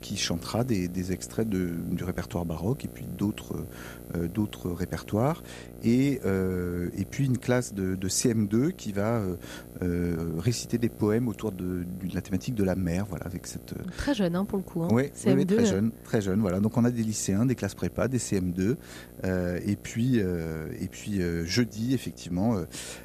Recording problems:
electrical hum; noticeable; throughout; 60 Hz, 20 dB below the speech

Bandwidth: 14.5 kHz